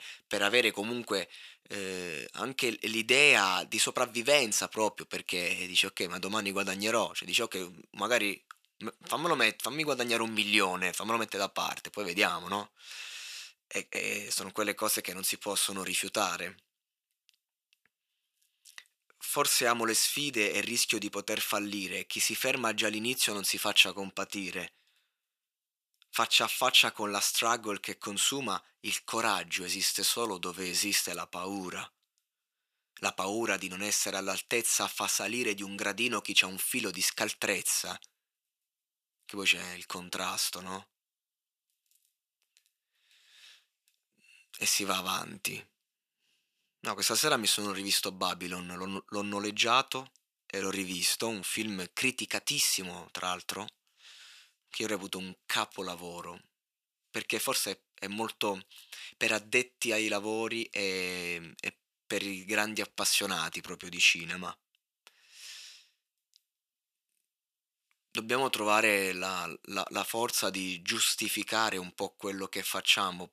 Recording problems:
thin; very; fading below 450 Hz

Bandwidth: 14.5 kHz